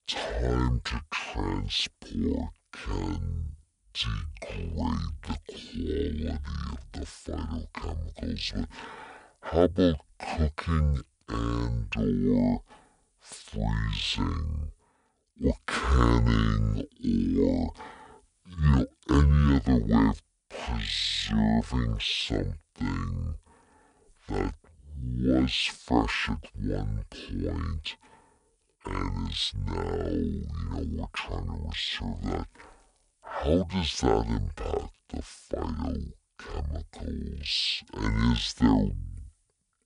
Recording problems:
wrong speed and pitch; too slow and too low; 0.5 times normal speed

